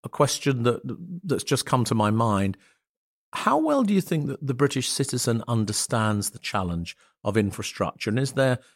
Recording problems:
none

